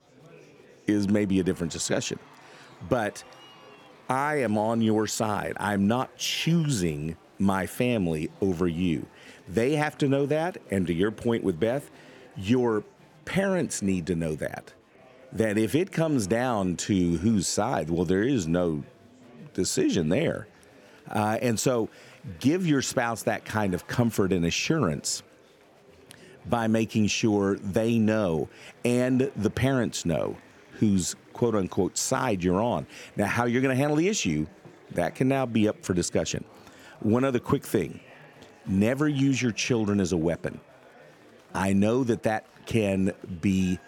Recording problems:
chatter from many people; faint; throughout; 25 dB below the speech

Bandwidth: 18 kHz